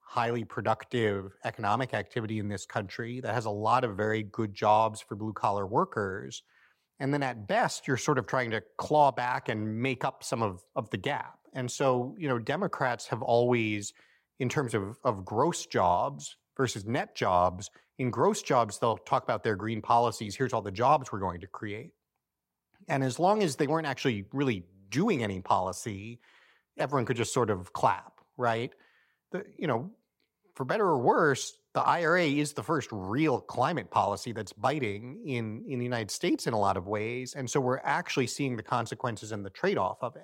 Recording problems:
muffled; slightly; fading above 3.5 kHz

